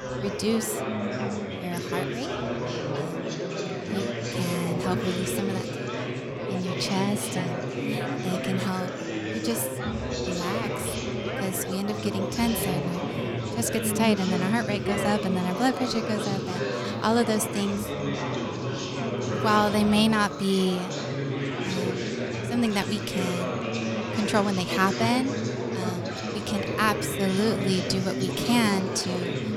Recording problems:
chatter from many people; loud; throughout; 2 dB below the speech

